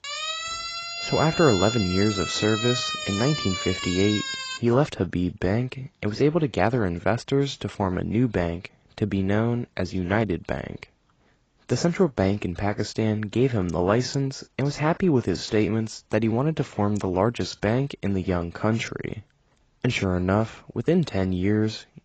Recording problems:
garbled, watery; badly; nothing above 7.5 kHz
siren; noticeable; until 4.5 s; peak 2 dB below the speech

